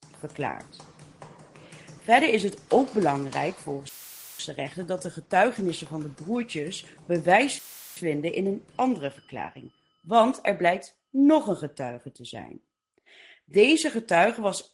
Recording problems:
garbled, watery; slightly; nothing above 11 kHz
household noises; faint; throughout; 25 dB below the speech
audio cutting out; filled with static; at 4 s and at 7.5 s

